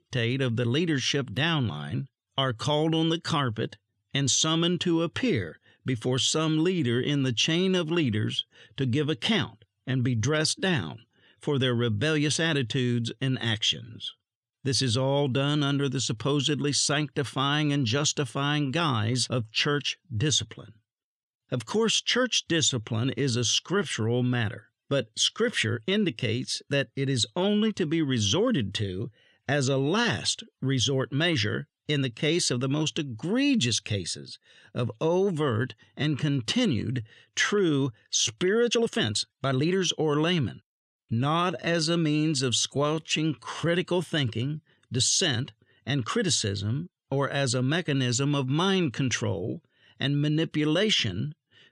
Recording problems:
uneven, jittery; strongly; from 39 to 44 s

